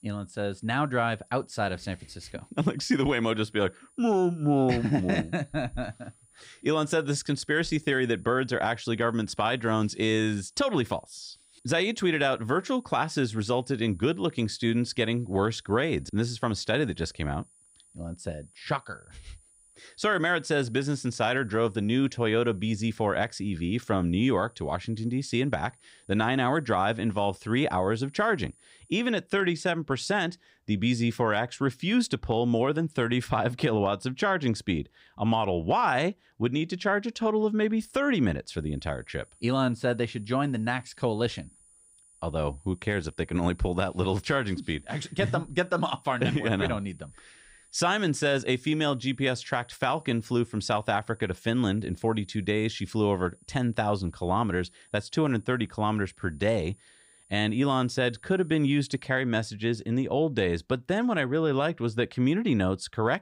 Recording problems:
high-pitched whine; faint; until 29 s and from 39 to 59 s; 9.5 kHz, 30 dB below the speech

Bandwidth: 15.5 kHz